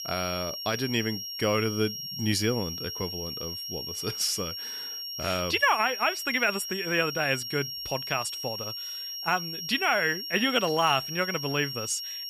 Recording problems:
high-pitched whine; loud; throughout; 5.5 kHz, 6 dB below the speech

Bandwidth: 15 kHz